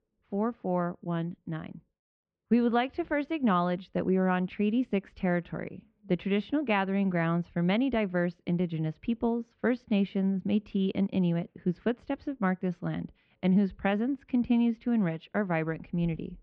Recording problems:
muffled; very; fading above 2.5 kHz

